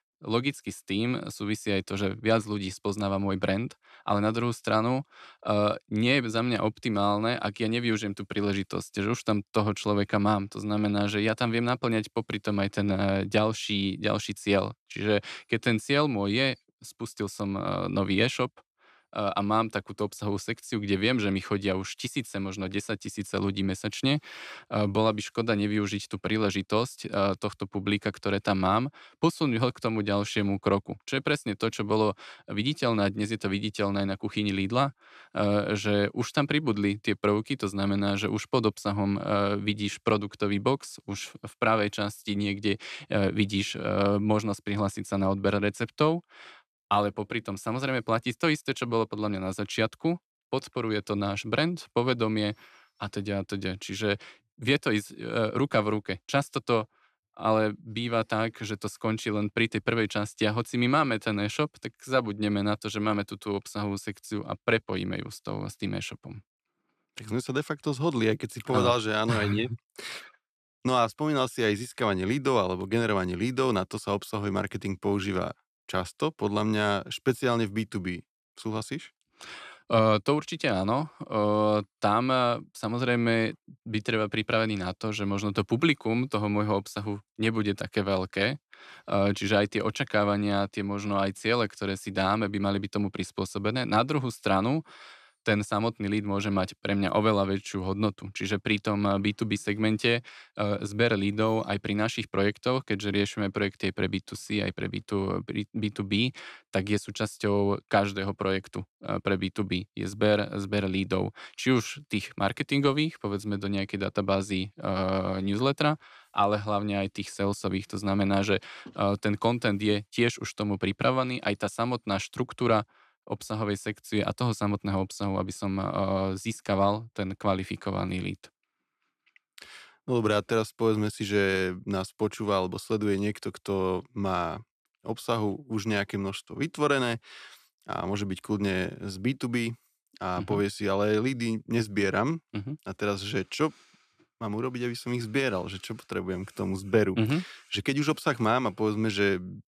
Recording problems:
none

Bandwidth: 14 kHz